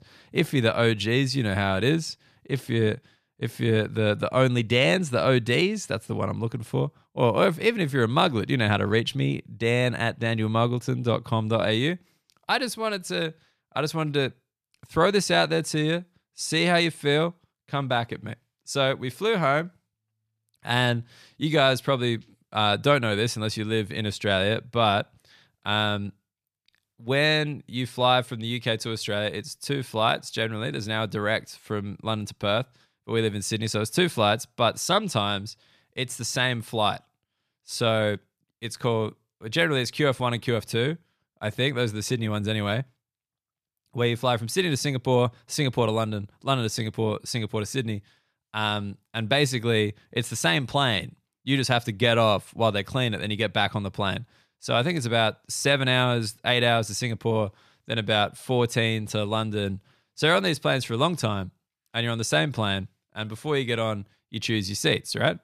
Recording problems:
none

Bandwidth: 14.5 kHz